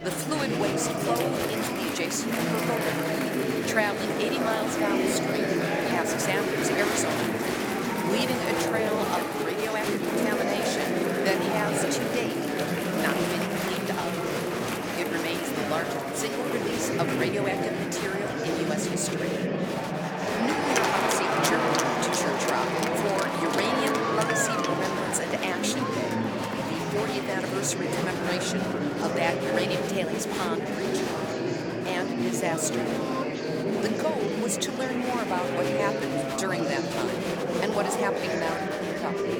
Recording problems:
murmuring crowd; very loud; throughout; 4 dB above the speech

